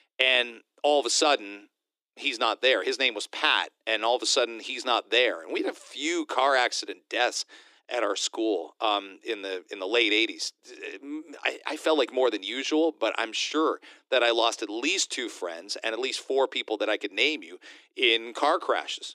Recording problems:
thin; very; fading below 300 Hz

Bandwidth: 15 kHz